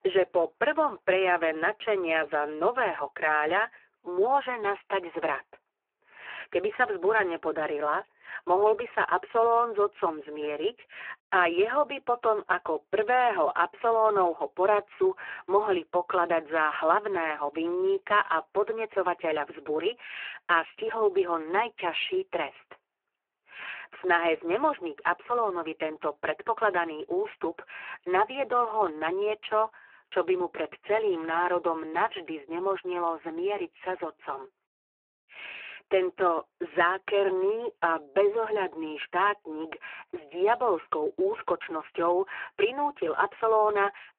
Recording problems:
phone-call audio; poor line

